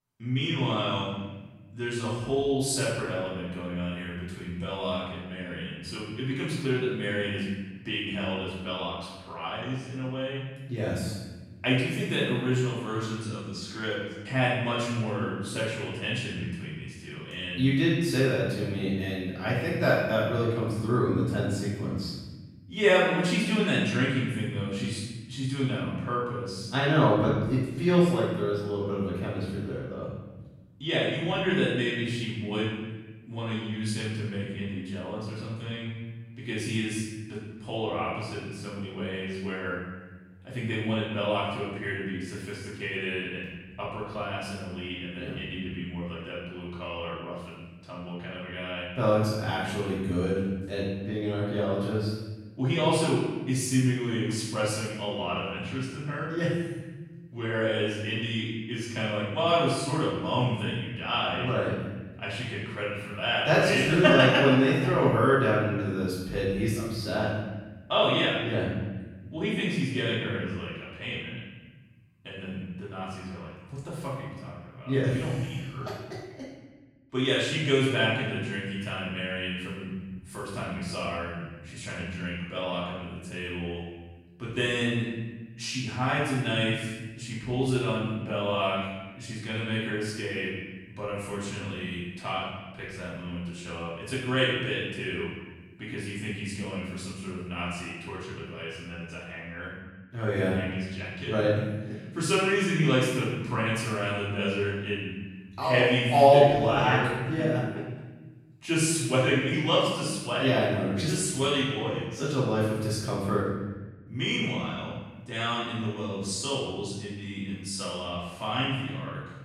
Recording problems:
room echo; strong; dies away in 1.3 s
off-mic speech; far

